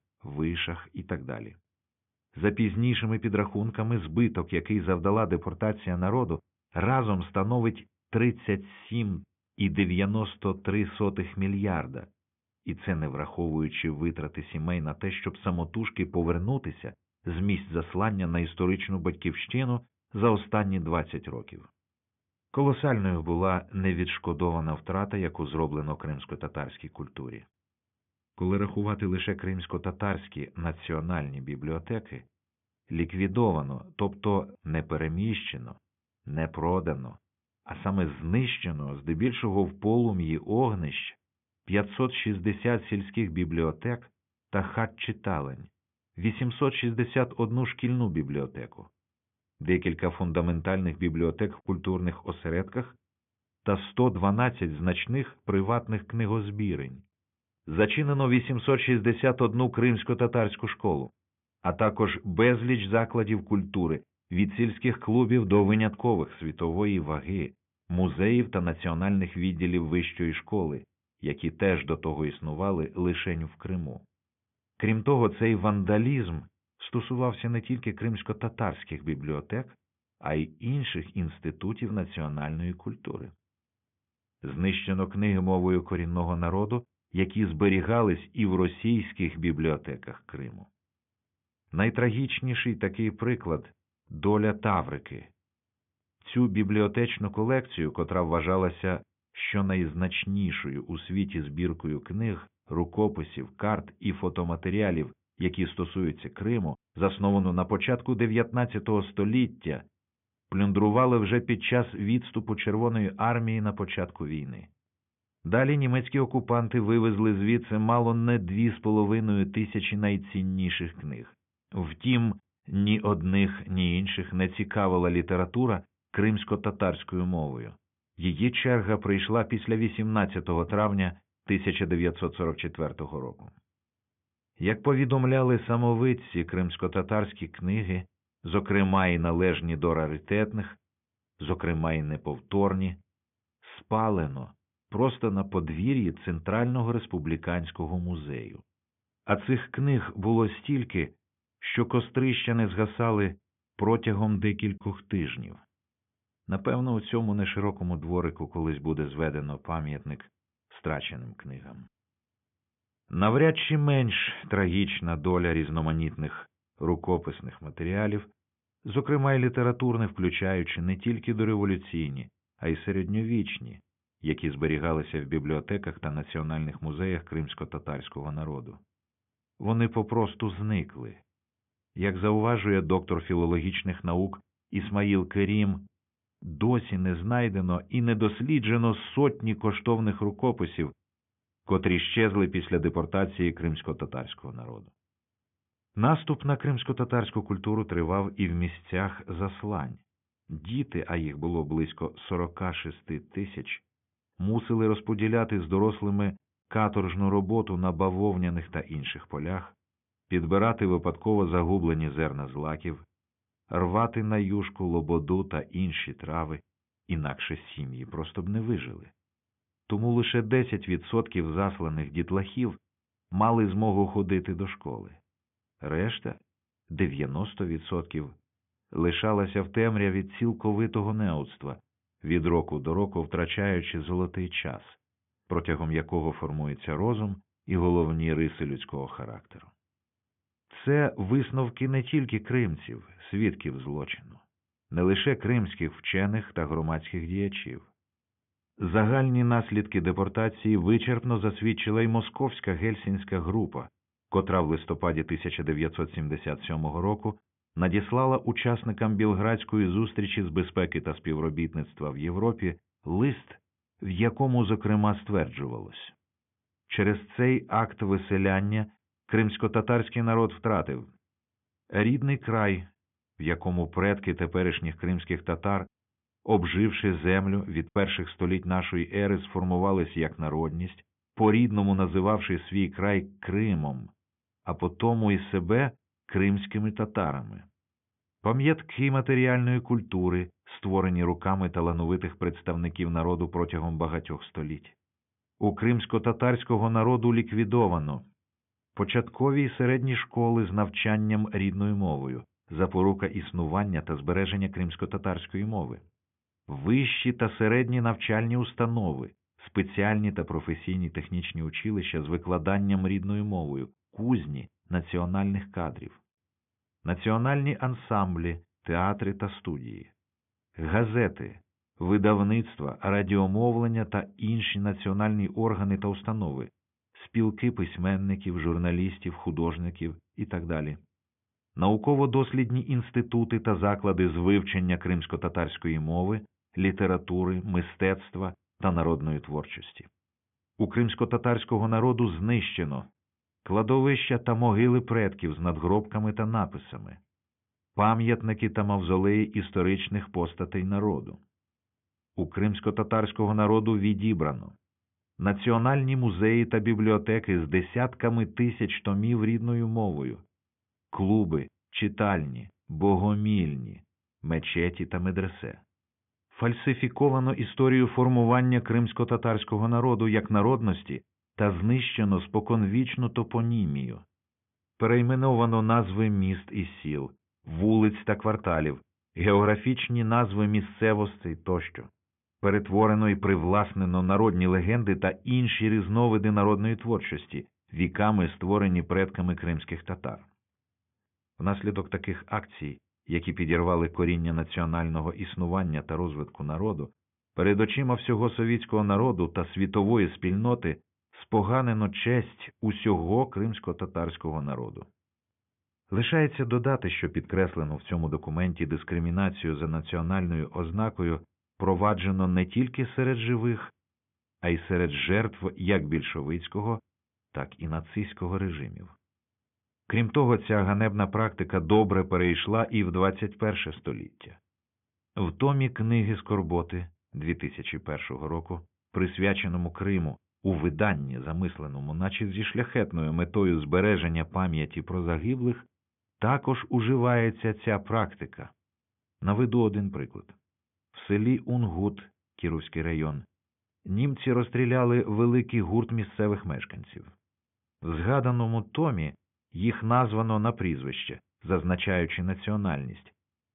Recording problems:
high frequencies cut off; severe; nothing above 3.5 kHz

